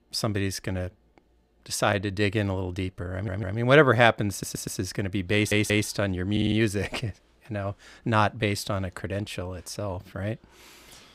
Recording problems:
audio stuttering; 4 times, first at 3 s

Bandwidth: 15.5 kHz